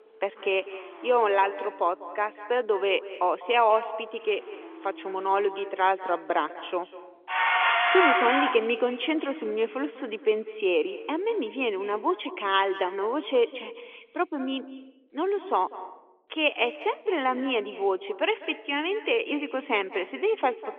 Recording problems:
echo of what is said; noticeable; throughout; 200 ms later, 15 dB below the speech
phone-call audio; nothing above 3.5 kHz
traffic noise; very loud; until 11 s; 4 dB above the speech

